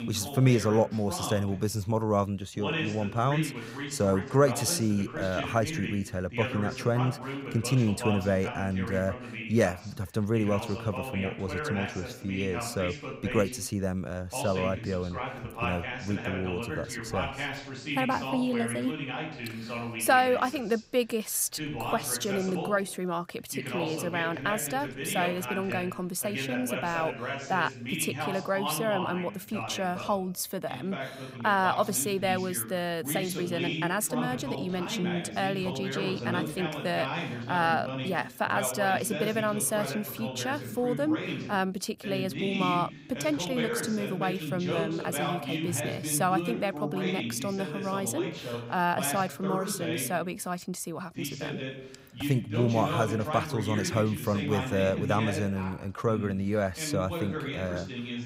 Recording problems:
voice in the background; loud; throughout; 6 dB below the speech

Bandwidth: 15.5 kHz